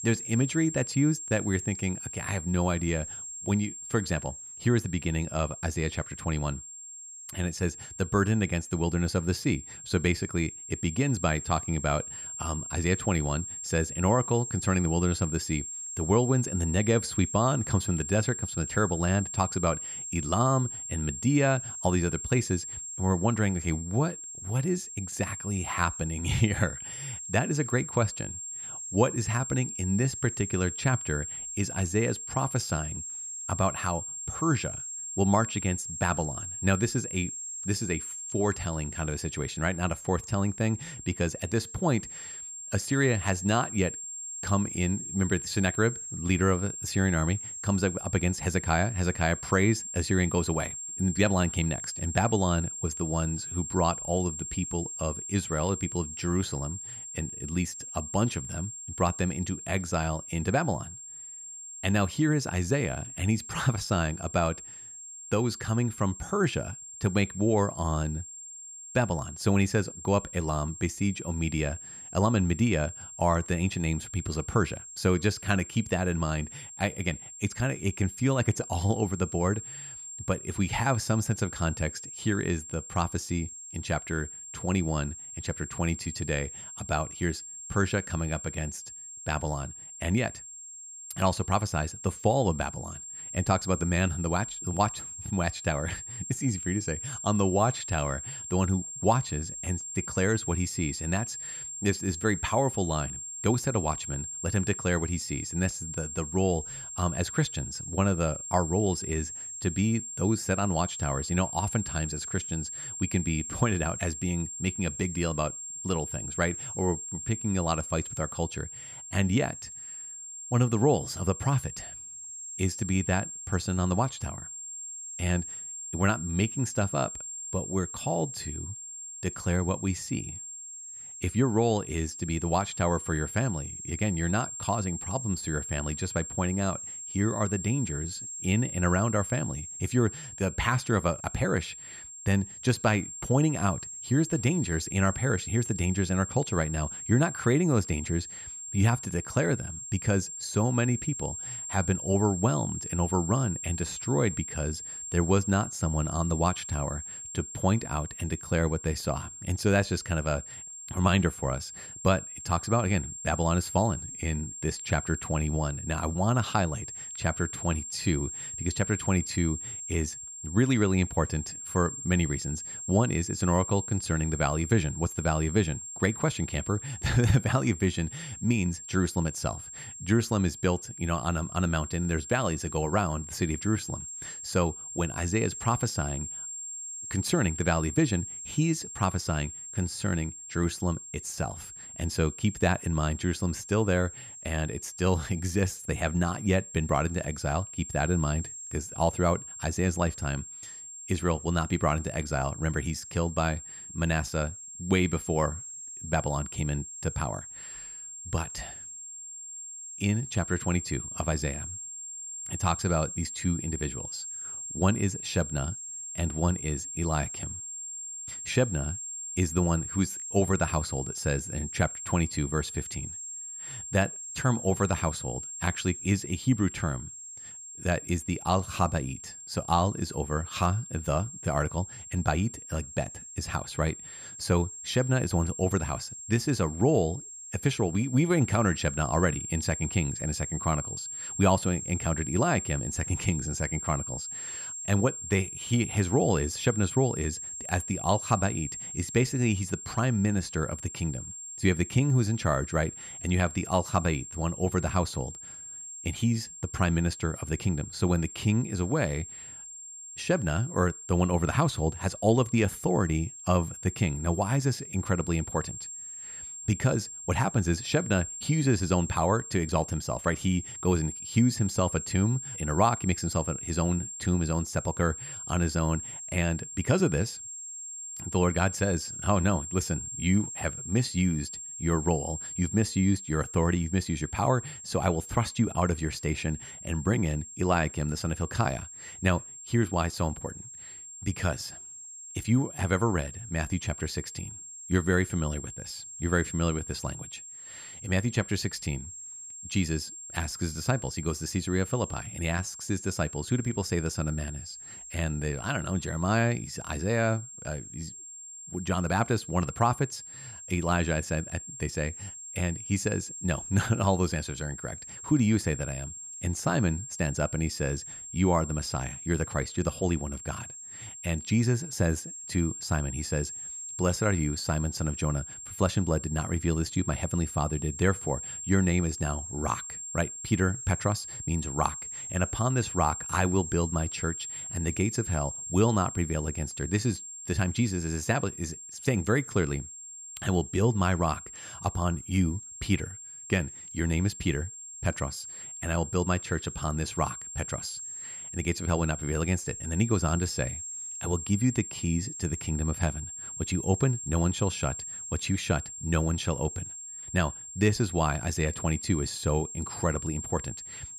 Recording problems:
high-pitched whine; loud; throughout; 7.5 kHz, 8 dB below the speech

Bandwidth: 15 kHz